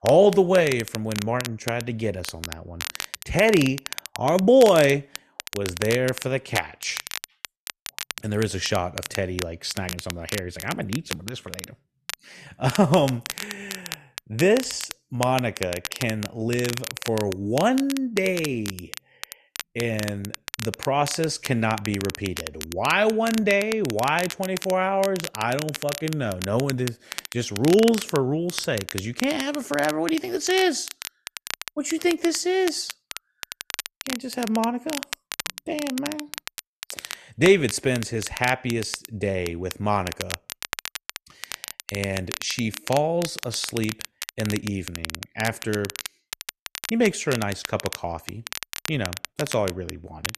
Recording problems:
crackle, like an old record; loud; 10 dB below the speech

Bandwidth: 13.5 kHz